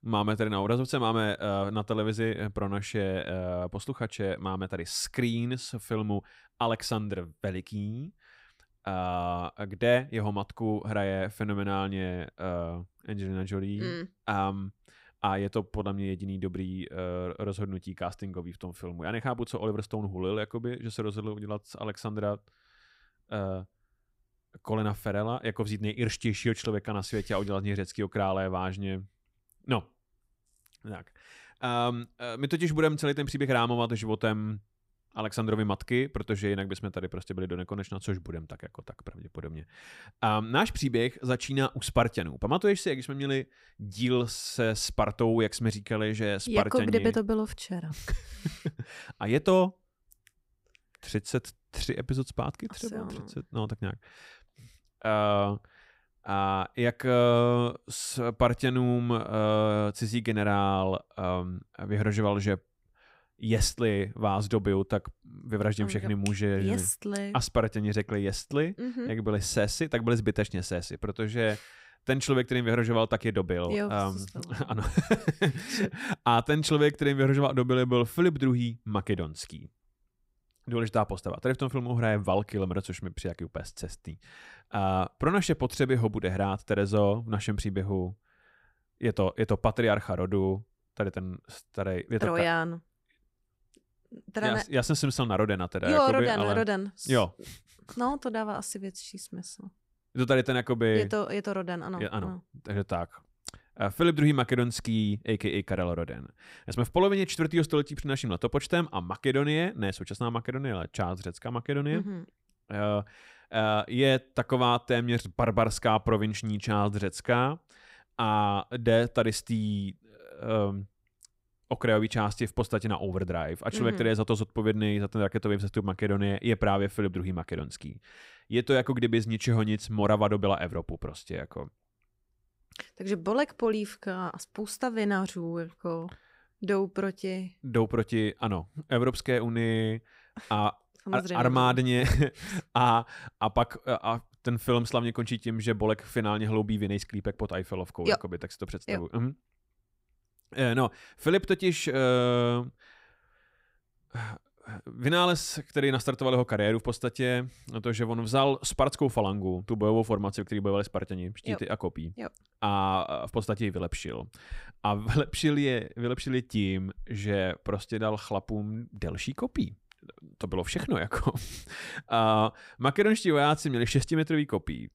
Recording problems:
none

